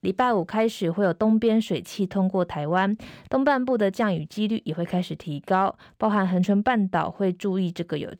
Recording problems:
none

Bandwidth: 18 kHz